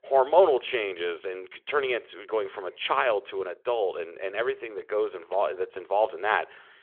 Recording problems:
phone-call audio; nothing above 3.5 kHz

